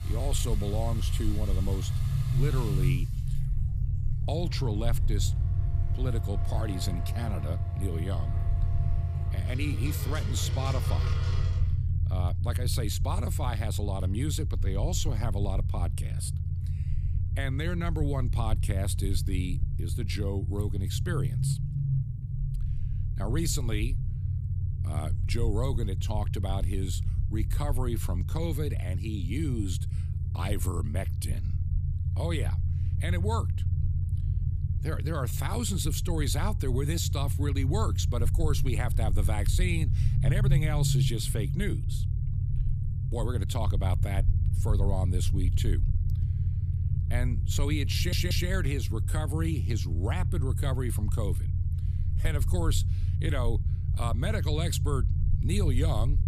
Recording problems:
low rumble; loud; throughout; 8 dB below the speech
household noises; noticeable; until 12 s; 10 dB below the speech
audio stuttering; at 48 s

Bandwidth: 14.5 kHz